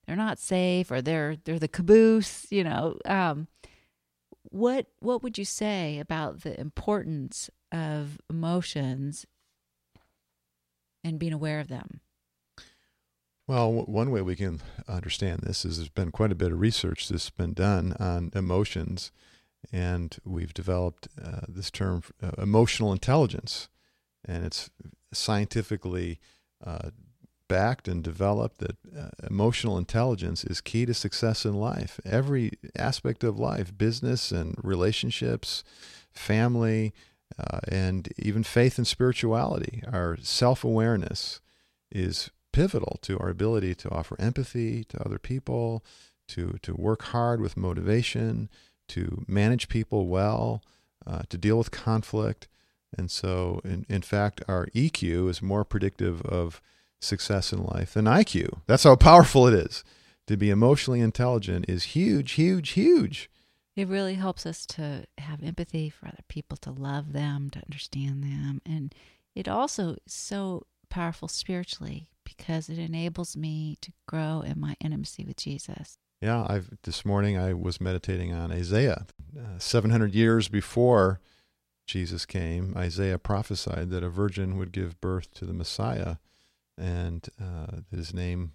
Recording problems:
none

